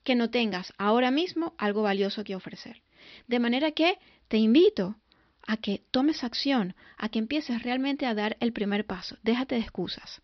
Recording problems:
high frequencies cut off; noticeable; nothing above 5.5 kHz

